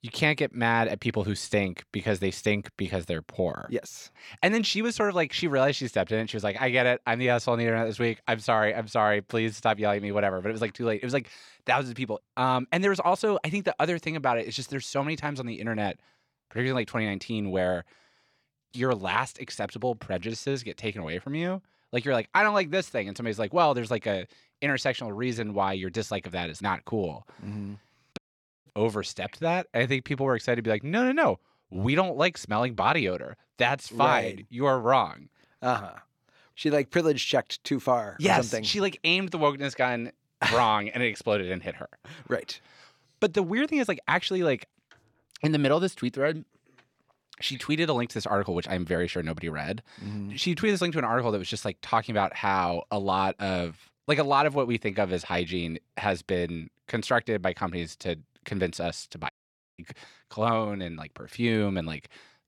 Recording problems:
audio cutting out; at 28 s and at 59 s

